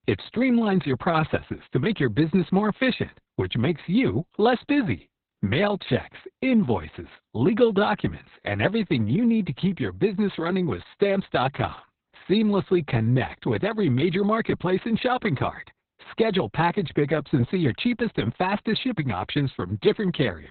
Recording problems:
garbled, watery; badly; nothing above 4 kHz

